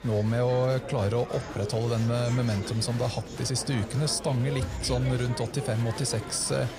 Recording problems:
murmuring crowd; loud; throughout; 10 dB below the speech

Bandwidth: 15.5 kHz